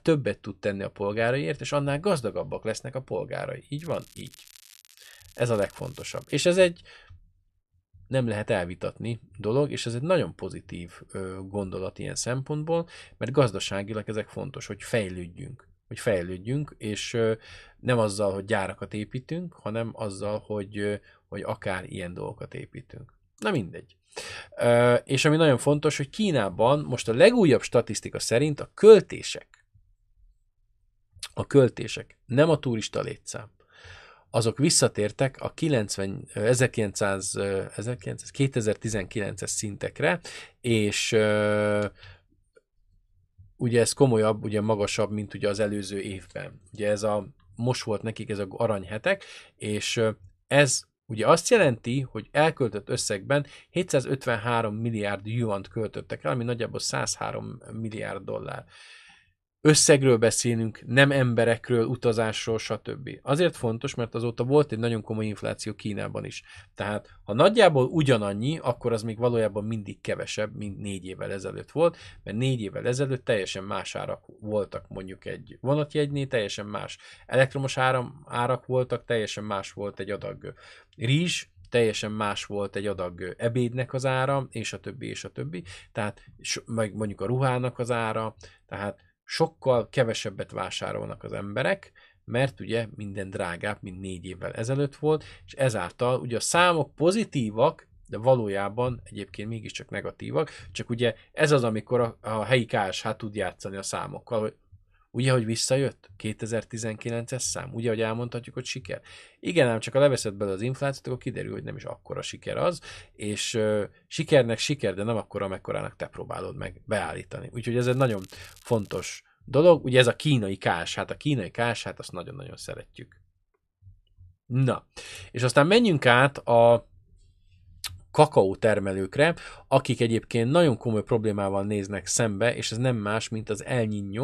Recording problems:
crackling; faint; from 4 to 6.5 s and from 1:58 to 1:59; 25 dB below the speech
abrupt cut into speech; at the end

